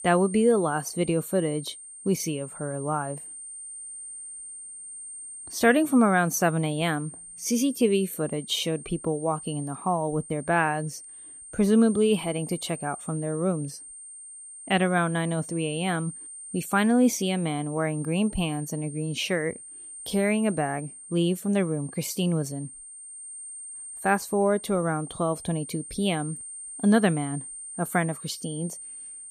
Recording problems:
high-pitched whine; noticeable; throughout; 8.5 kHz, 15 dB below the speech

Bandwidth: 15 kHz